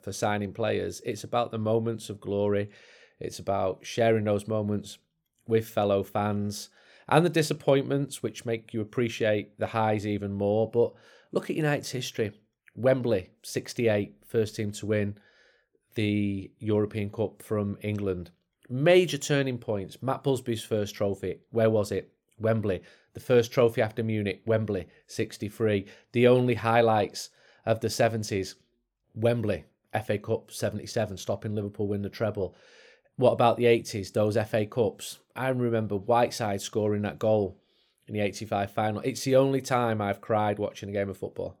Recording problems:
none

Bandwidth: 18.5 kHz